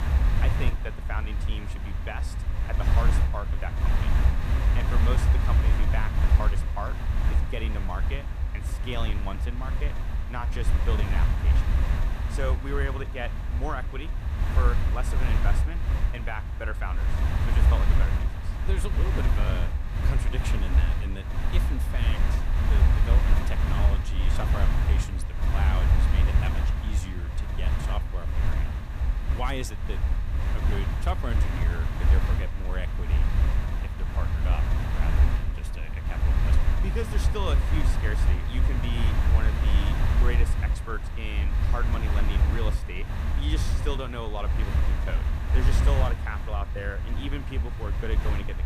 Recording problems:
wind noise on the microphone; heavy; 1 dB below the speech

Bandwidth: 14.5 kHz